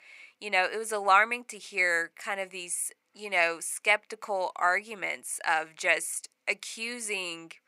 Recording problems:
thin; very; fading below 800 Hz

